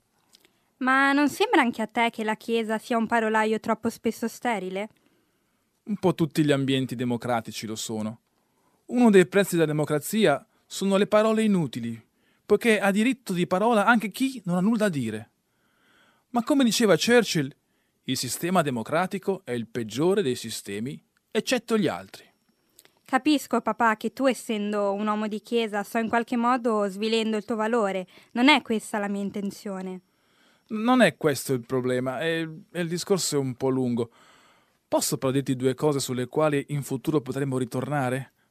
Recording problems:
none

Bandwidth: 14.5 kHz